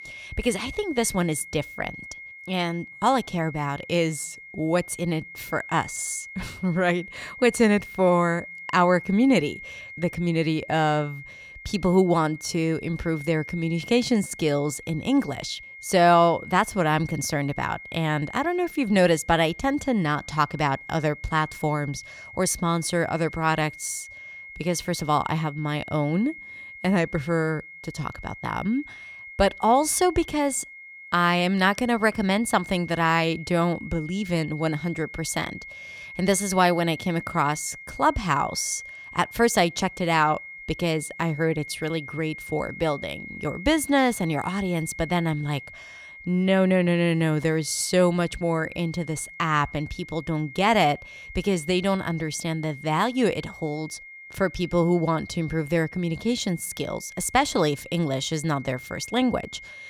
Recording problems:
high-pitched whine; noticeable; throughout; 2 kHz, 15 dB below the speech

